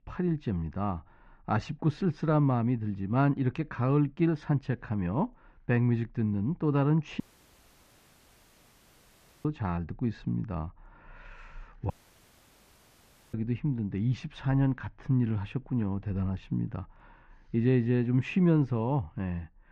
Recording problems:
muffled; very; fading above 2.5 kHz
audio cutting out; at 7 s for 2 s and at 12 s for 1.5 s

